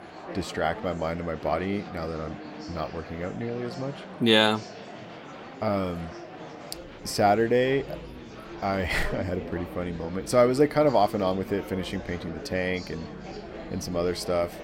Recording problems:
murmuring crowd; noticeable; throughout; 15 dB below the speech

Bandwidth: 16 kHz